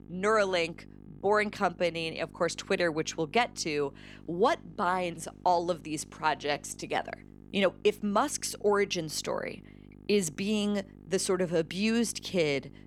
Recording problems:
electrical hum; faint; throughout; 50 Hz, 30 dB below the speech

